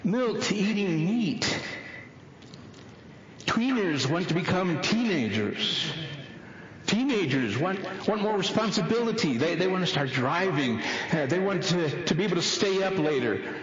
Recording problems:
echo of what is said; strong; throughout; 210 ms later, 10 dB below the speech
squashed, flat; heavily
distortion; slight; 10 dB below the speech
garbled, watery; slightly

